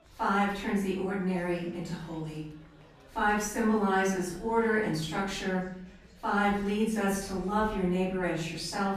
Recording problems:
off-mic speech; far
room echo; noticeable; dies away in 0.7 s
murmuring crowd; faint; throughout; 30 dB below the speech

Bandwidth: 14.5 kHz